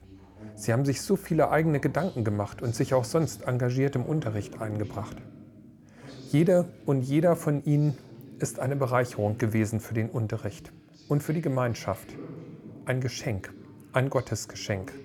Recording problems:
voice in the background; noticeable; throughout; 20 dB below the speech

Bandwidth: 18.5 kHz